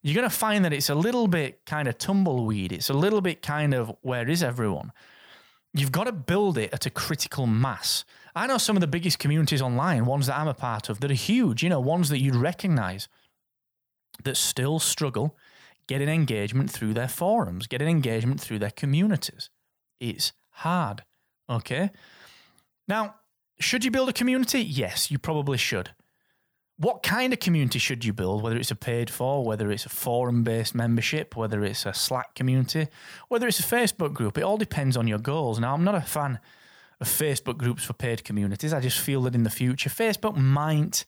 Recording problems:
none

